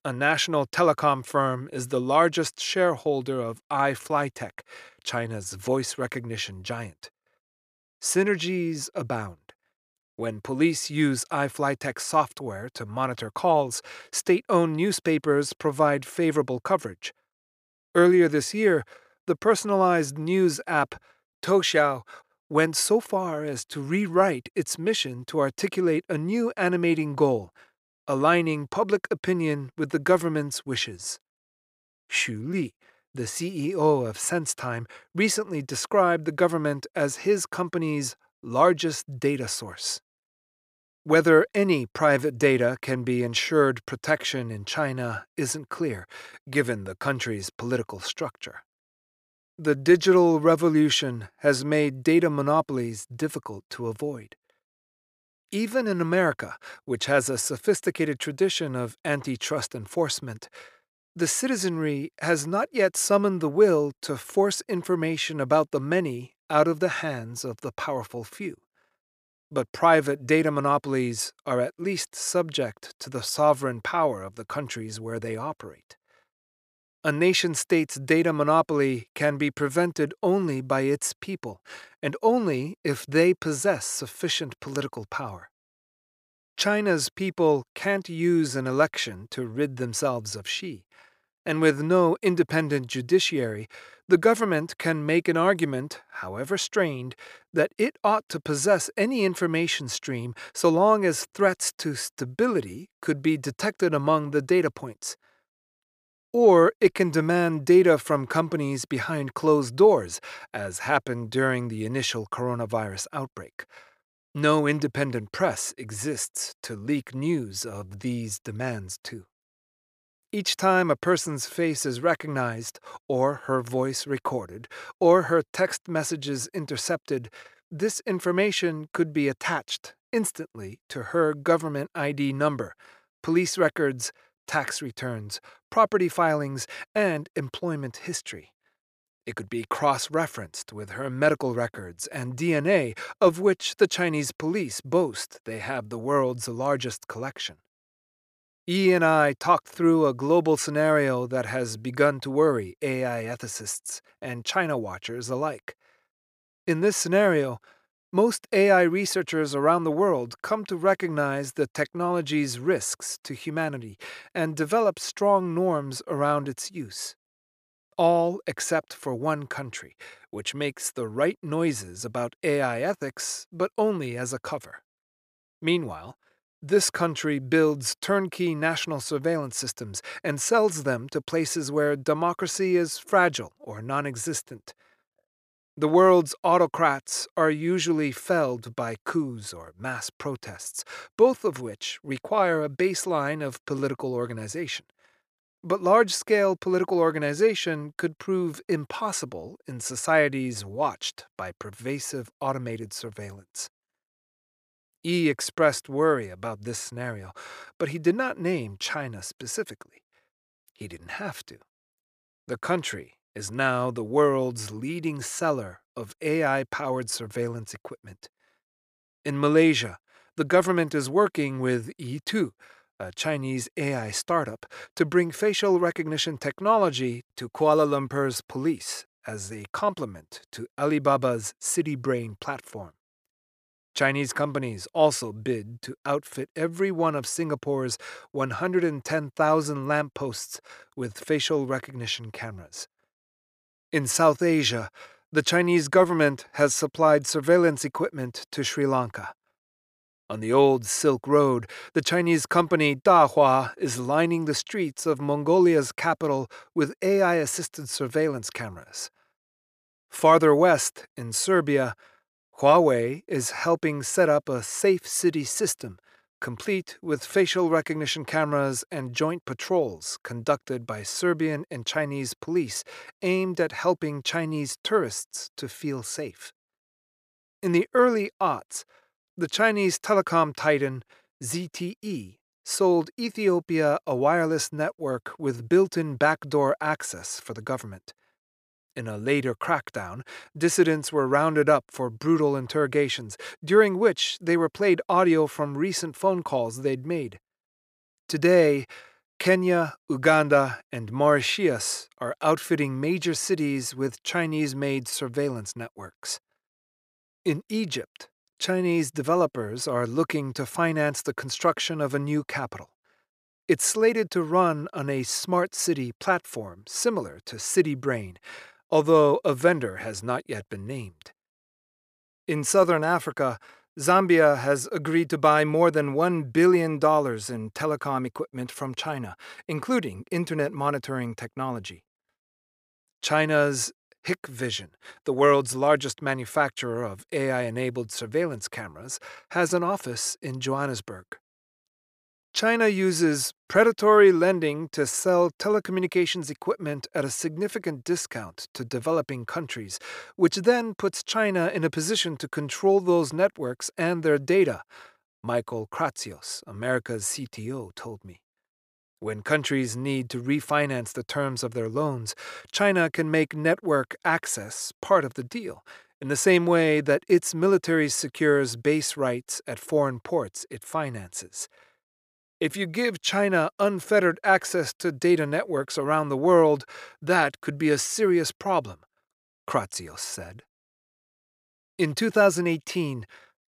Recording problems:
none

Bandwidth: 14.5 kHz